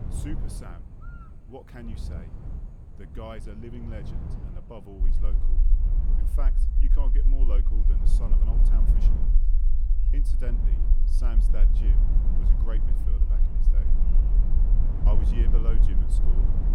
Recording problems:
wind noise on the microphone; heavy; 4 dB below the speech
low rumble; loud; from 5 s on; 5 dB below the speech
electrical hum; noticeable; throughout; 60 Hz, 20 dB below the speech
background chatter; faint; throughout; 3 voices, 30 dB below the speech

